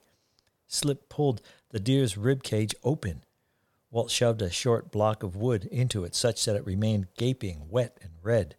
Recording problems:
none

